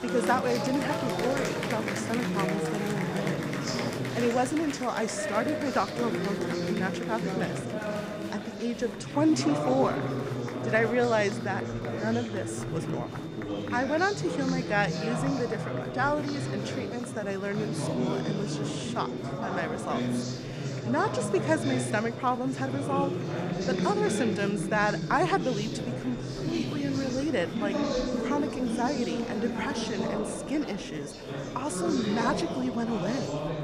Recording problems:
murmuring crowd; loud; throughout; 2 dB below the speech
high-pitched whine; faint; throughout; 3.5 kHz, 25 dB below the speech

